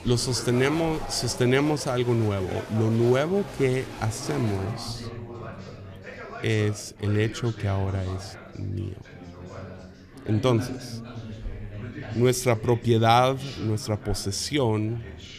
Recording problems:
chatter from many people; noticeable; throughout; 15 dB below the speech

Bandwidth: 14.5 kHz